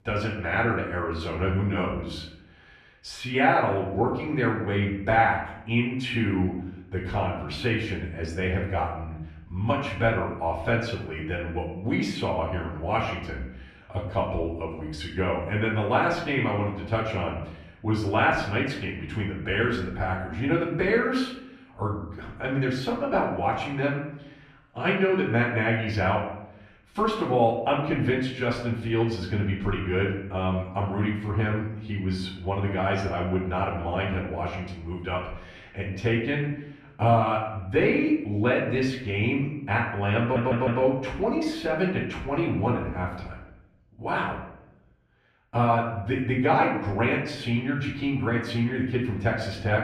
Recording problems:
off-mic speech; far
room echo; noticeable; dies away in 0.7 s
audio stuttering; at 40 s

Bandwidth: 14 kHz